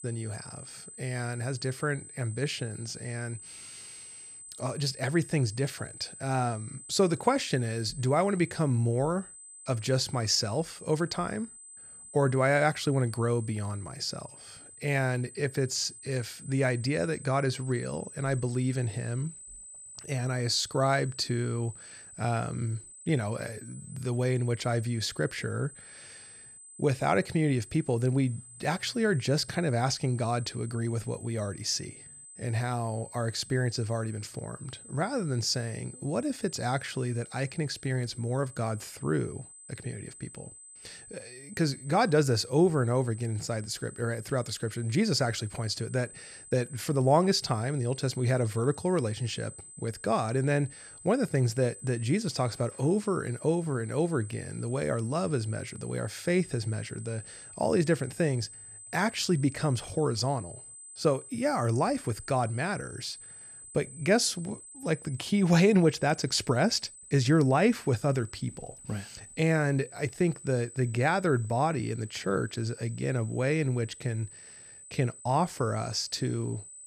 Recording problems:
high-pitched whine; noticeable; throughout; 8 kHz, 15 dB below the speech

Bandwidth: 14.5 kHz